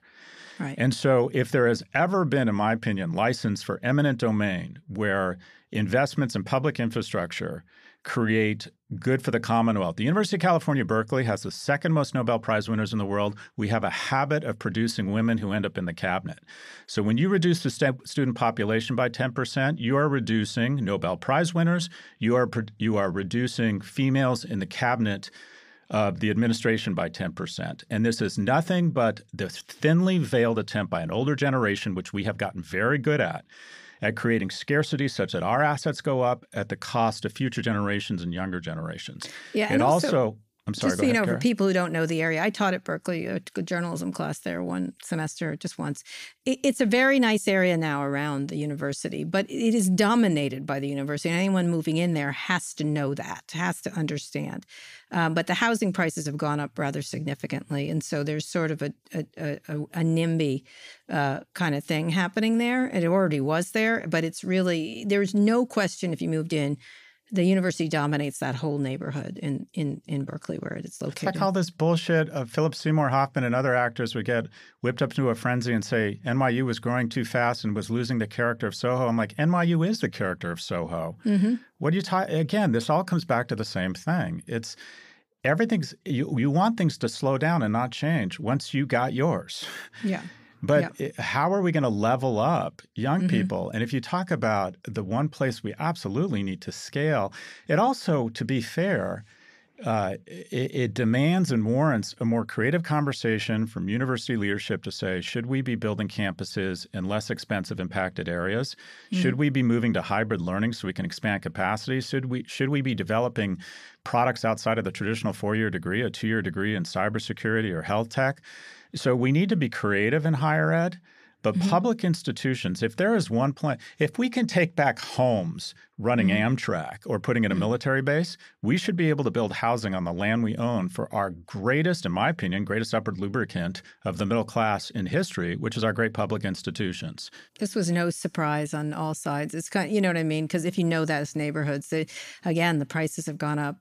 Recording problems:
none

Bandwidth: 15 kHz